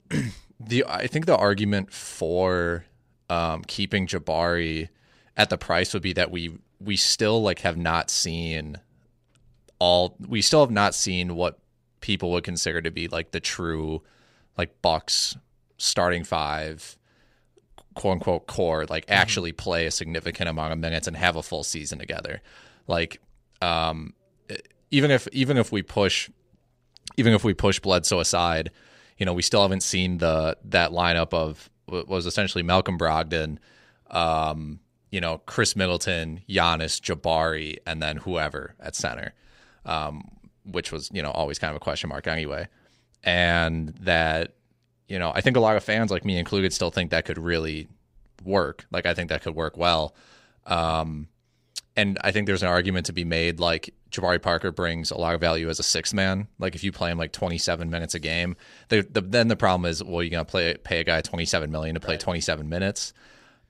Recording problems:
none

